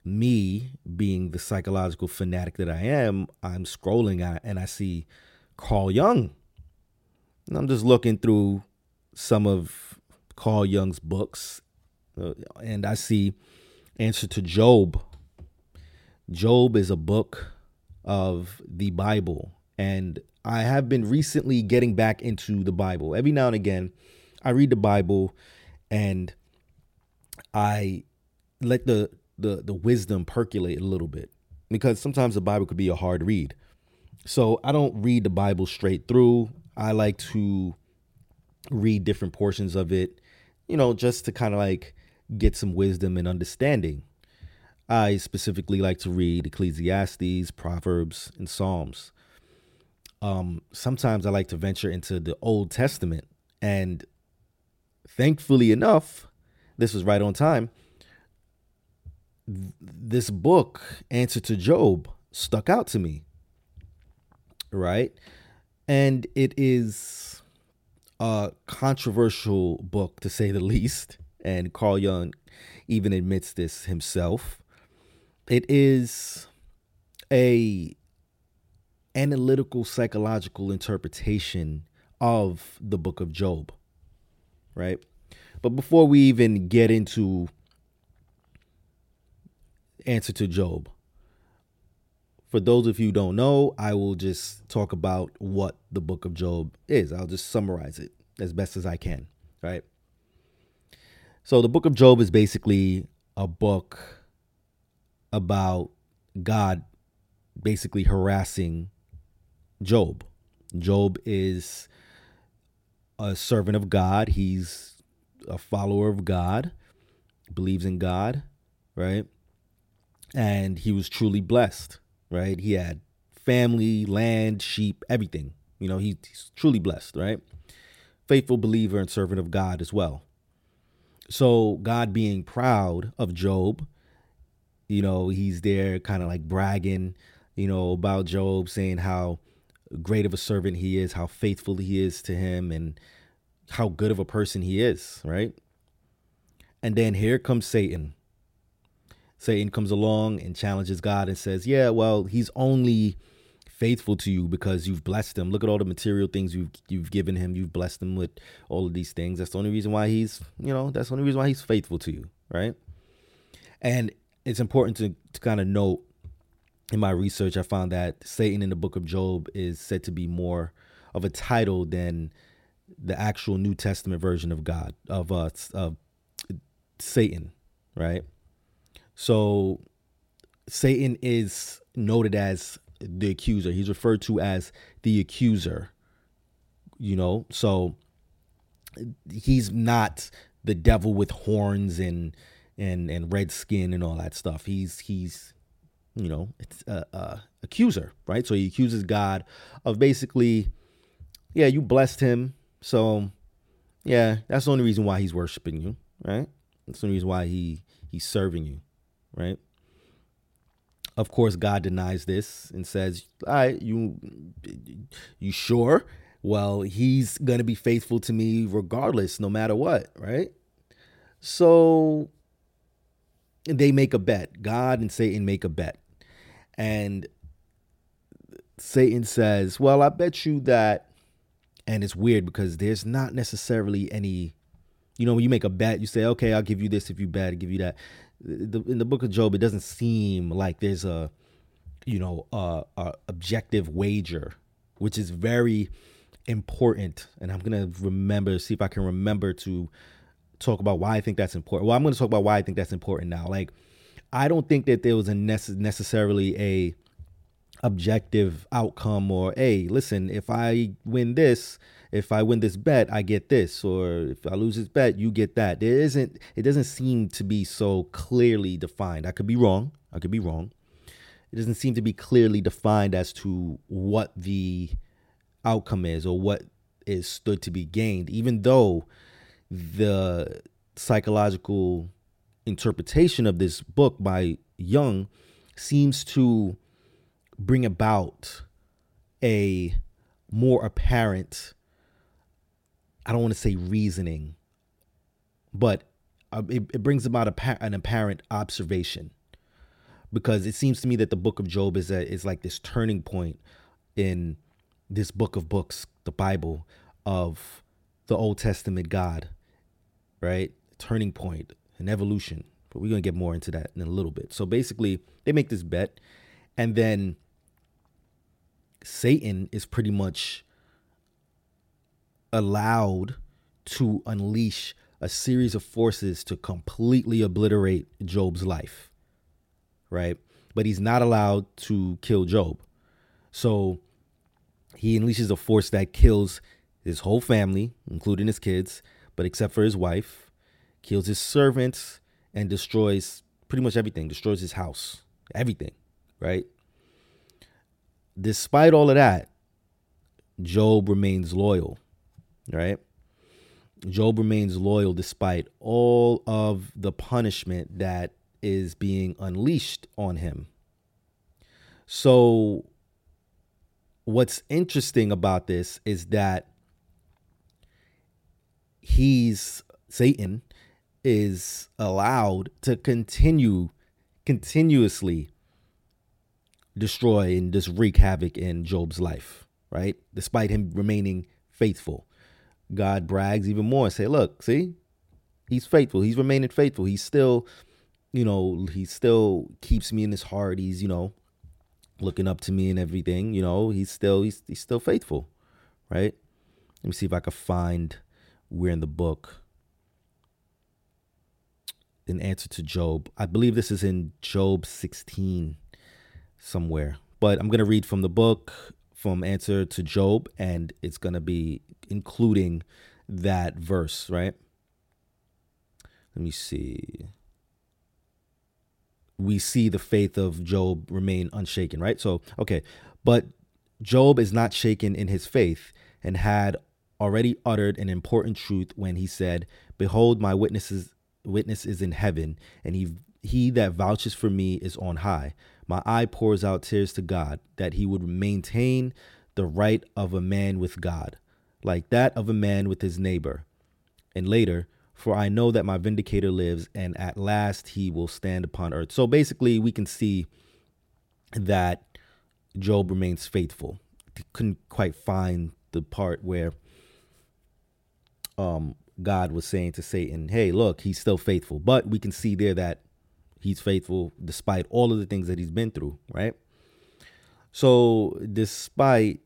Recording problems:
none

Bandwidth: 16.5 kHz